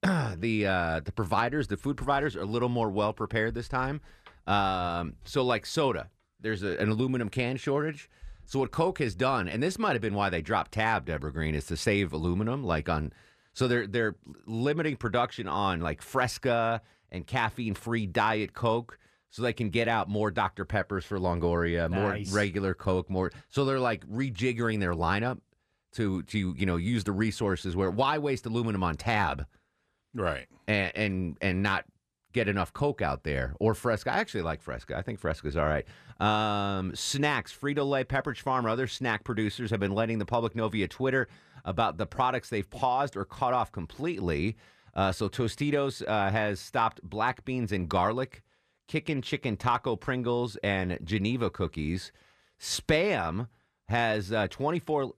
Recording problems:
none

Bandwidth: 14.5 kHz